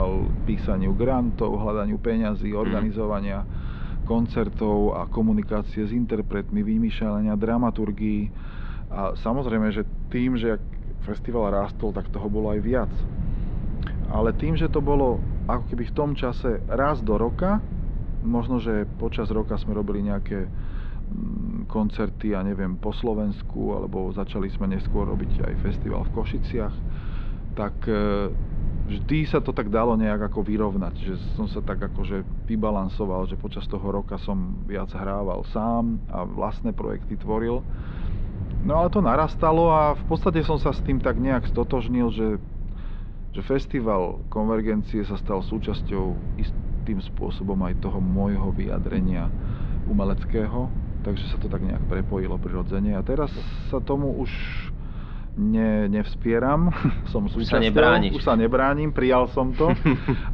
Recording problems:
muffled; slightly; fading above 4 kHz
low rumble; noticeable; throughout; 20 dB below the speech
abrupt cut into speech; at the start

